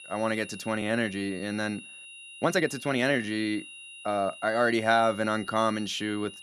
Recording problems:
high-pitched whine; noticeable; throughout; 3 kHz, 15 dB below the speech
uneven, jittery; strongly; from 1 to 5.5 s

